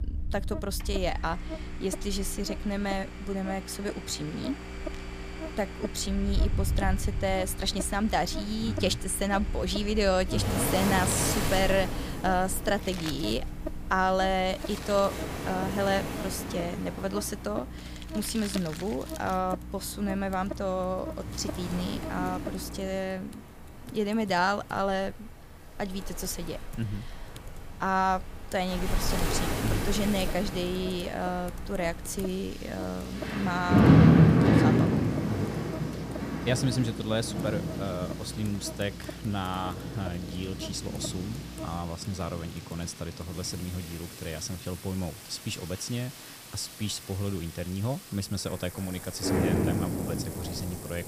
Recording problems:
rain or running water; very loud; throughout; 2 dB above the speech
electrical hum; noticeable; until 23 s and from 30 to 42 s; 60 Hz, 15 dB below the speech
household noises; noticeable; throughout; 15 dB below the speech

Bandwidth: 15 kHz